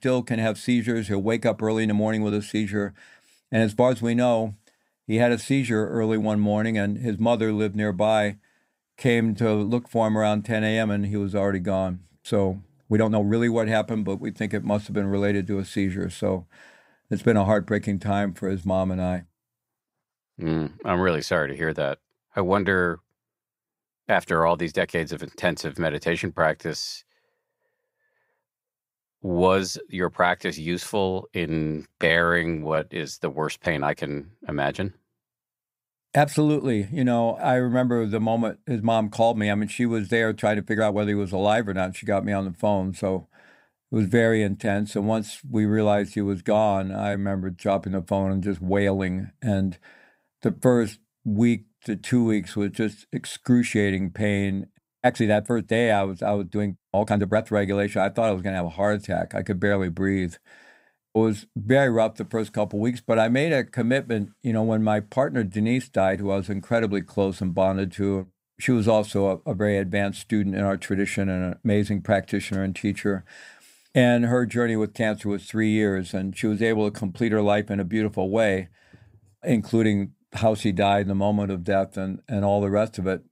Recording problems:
uneven, jittery; strongly; from 1.5 s to 1:20

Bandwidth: 15.5 kHz